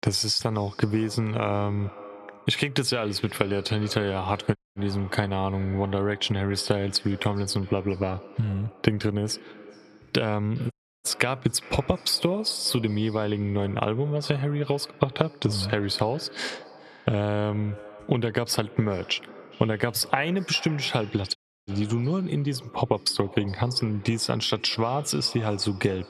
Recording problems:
echo of what is said; faint; throughout; 410 ms later, 20 dB below the speech
squashed, flat; somewhat
audio cutting out; at 4.5 s, at 11 s and at 21 s

